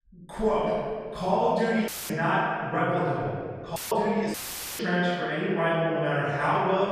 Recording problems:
room echo; strong; dies away in 1.9 s
off-mic speech; far
audio cutting out; filled with static; at 2 s, at 4 s and at 4.5 s

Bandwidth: 14.5 kHz